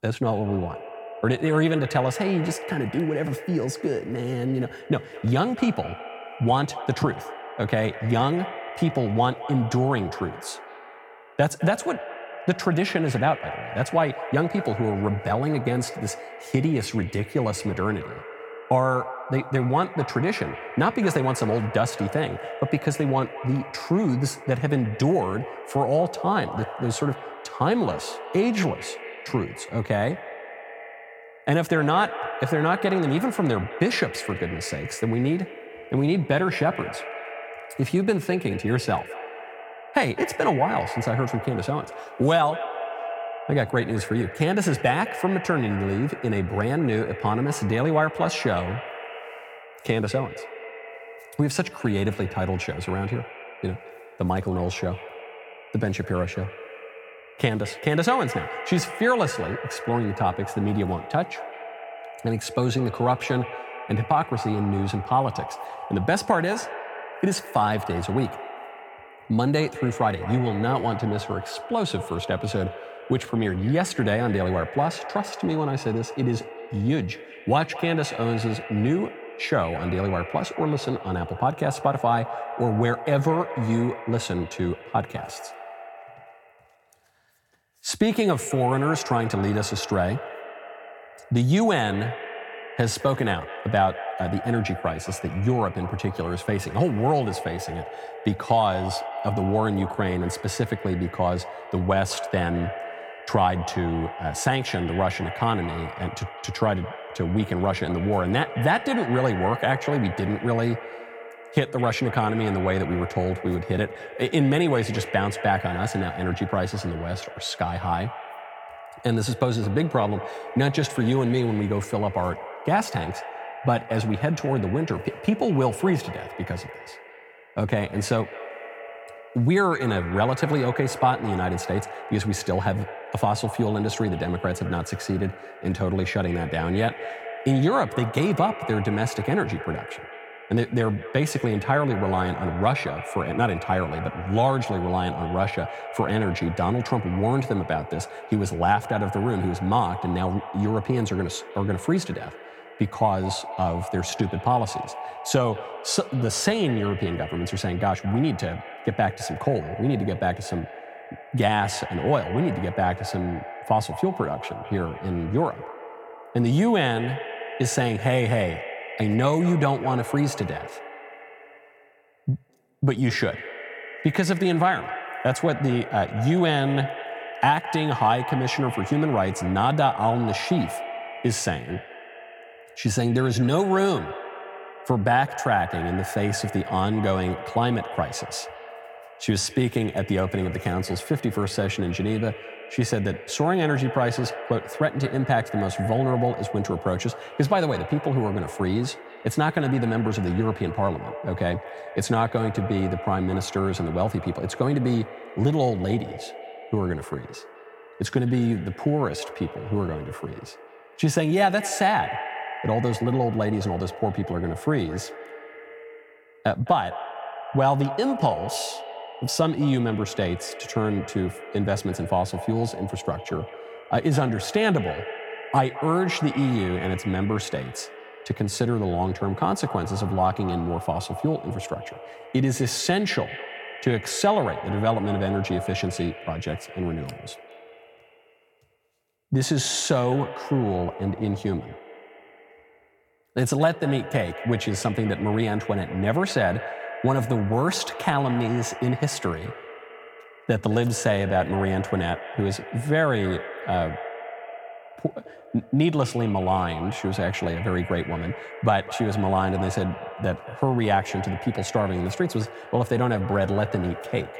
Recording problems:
echo of what is said; strong; throughout; 210 ms later, 10 dB below the speech

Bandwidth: 17 kHz